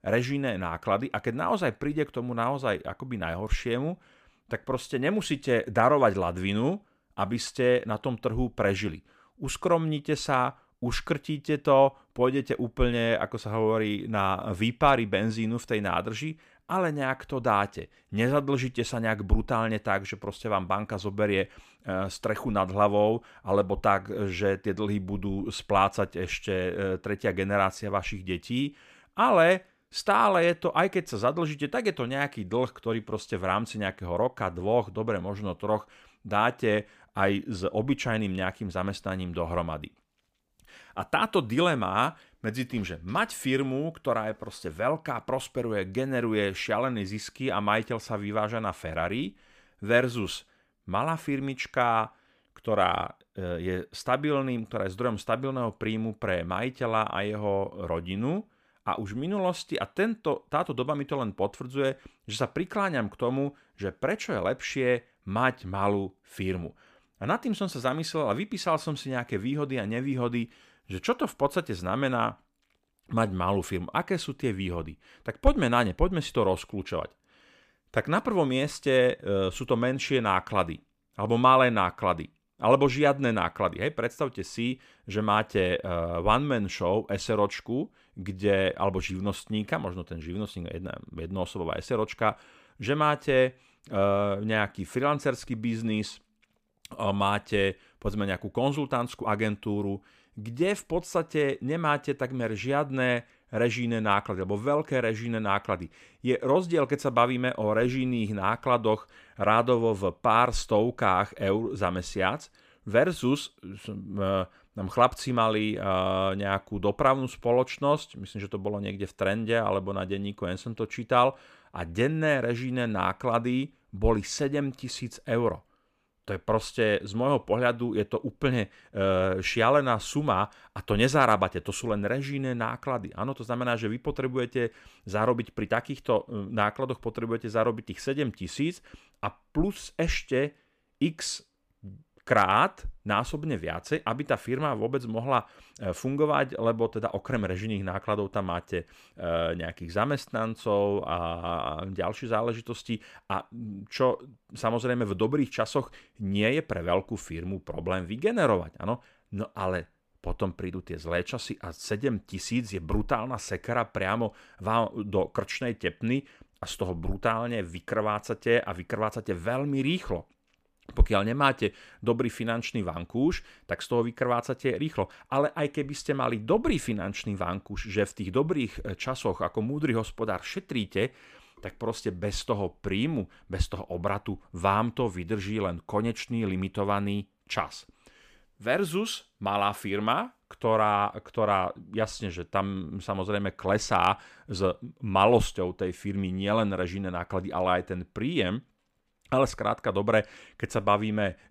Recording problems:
uneven, jittery; slightly; from 34 s to 1:39

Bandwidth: 15 kHz